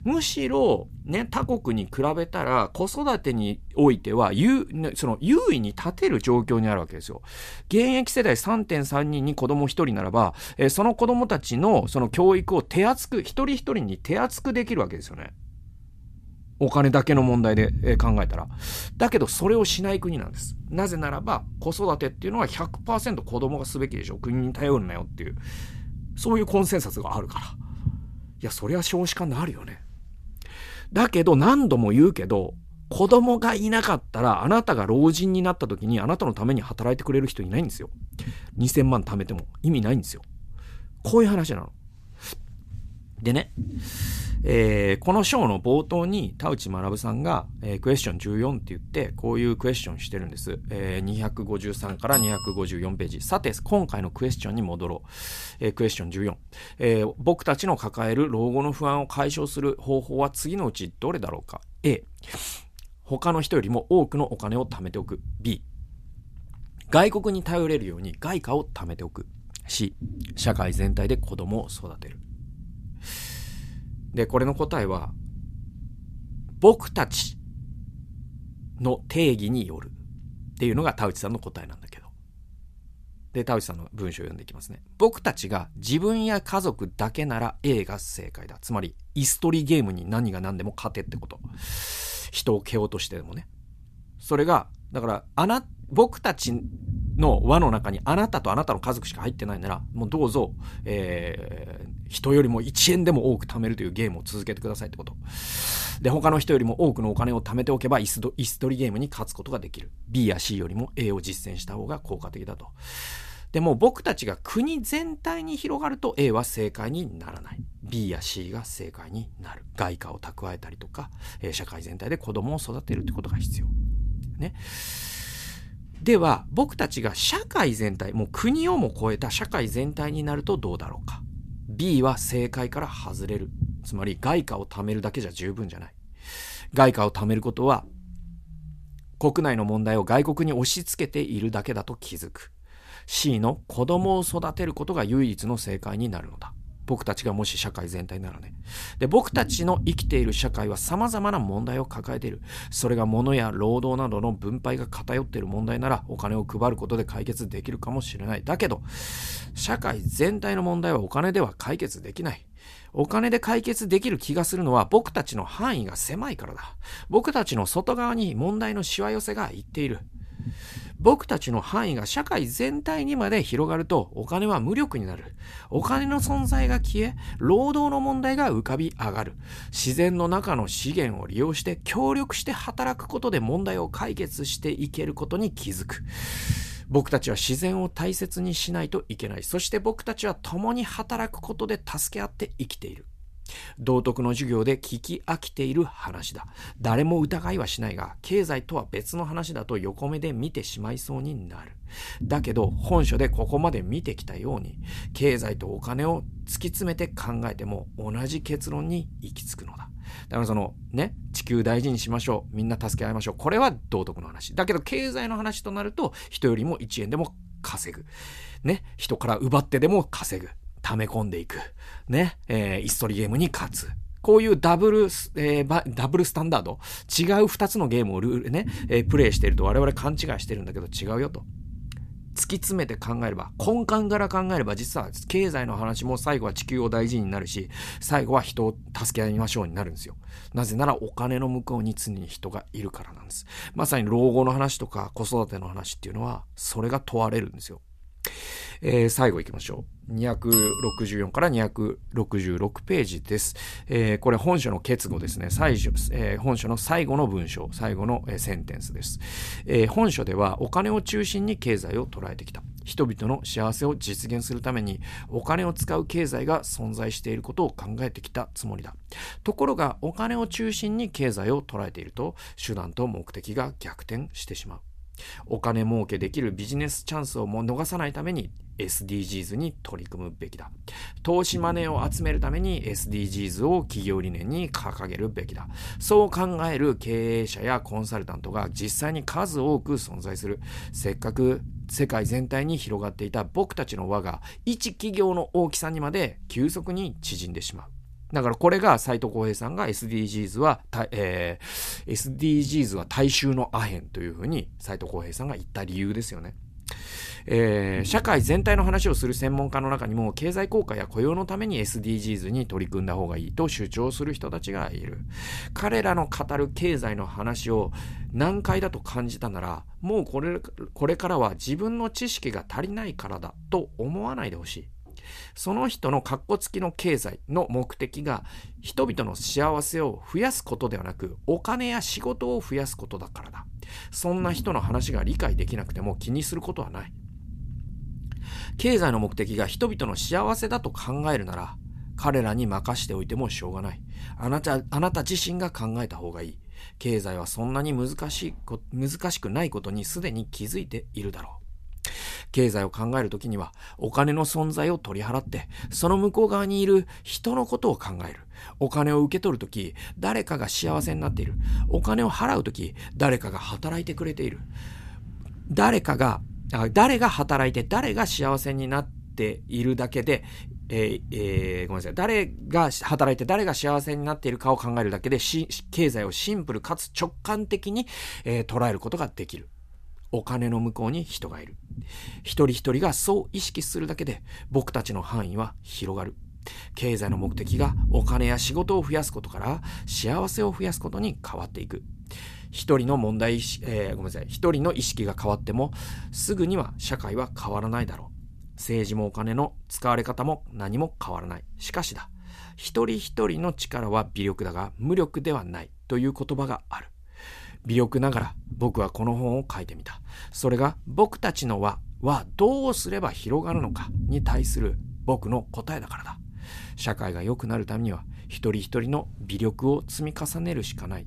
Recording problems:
low rumble; faint; throughout; 25 dB below the speech

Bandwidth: 14.5 kHz